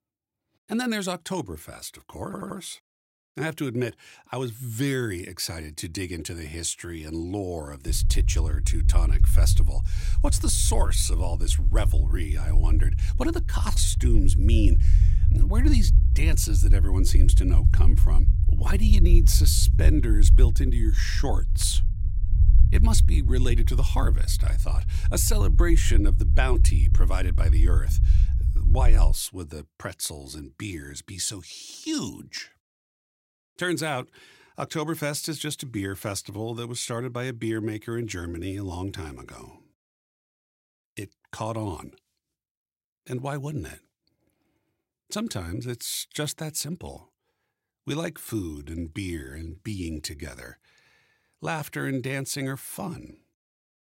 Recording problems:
low rumble; loud; from 8 to 29 s; 10 dB below the speech
audio stuttering; at 2.5 s

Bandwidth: 16 kHz